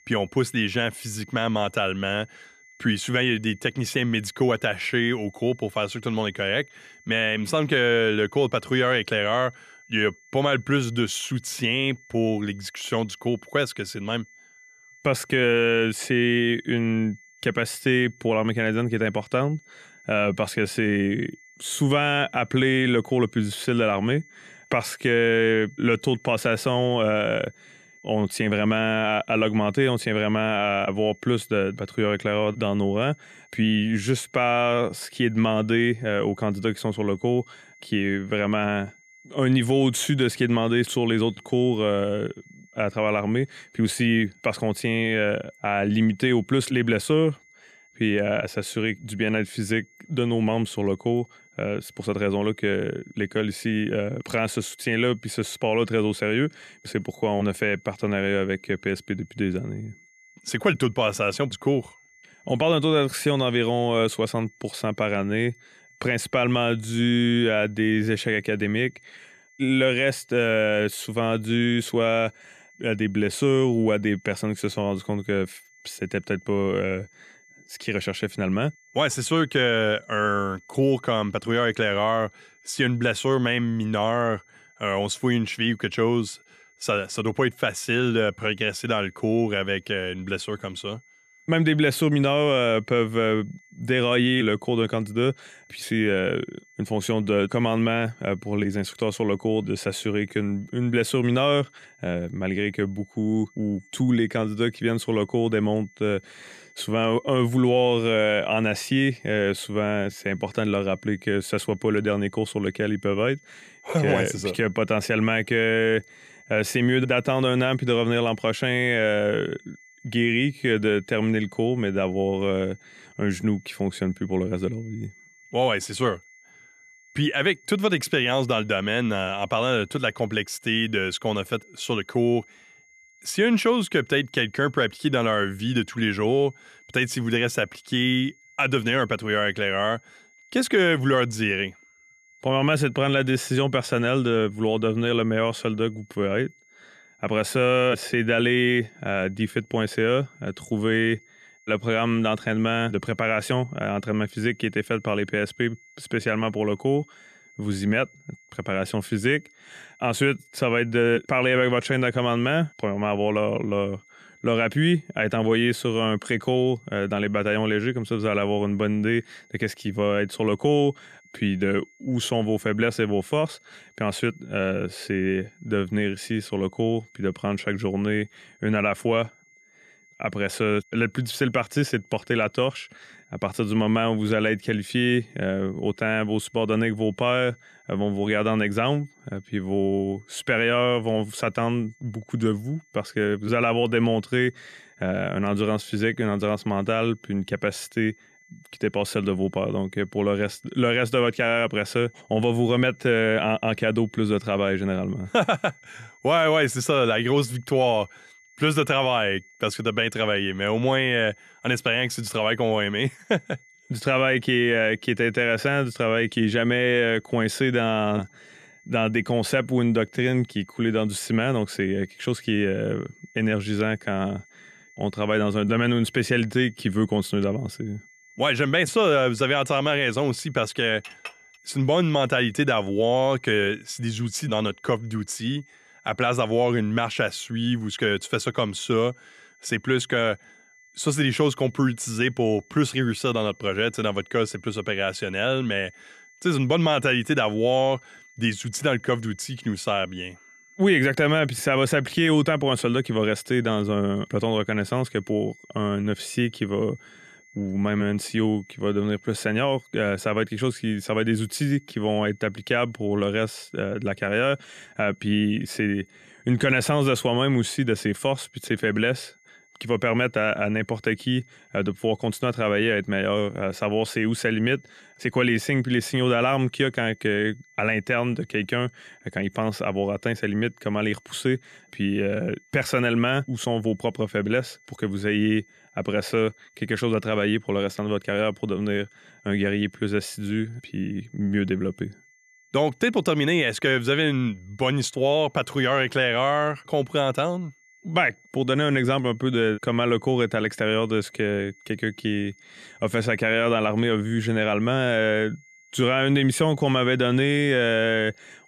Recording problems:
high-pitched whine; faint; throughout; 2 kHz, 30 dB below the speech
clattering dishes; faint; at 3:51; peak 15 dB below the speech

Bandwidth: 14 kHz